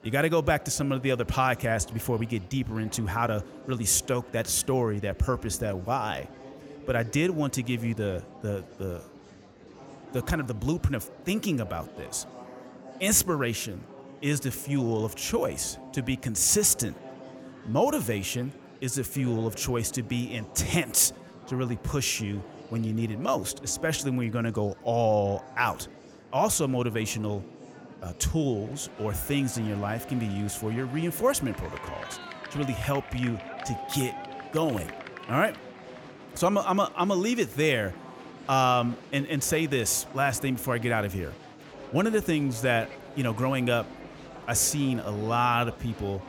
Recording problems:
murmuring crowd; noticeable; throughout; 15 dB below the speech

